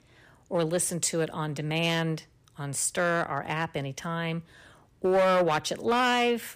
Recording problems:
distortion; slight; 5% of the sound clipped

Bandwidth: 15 kHz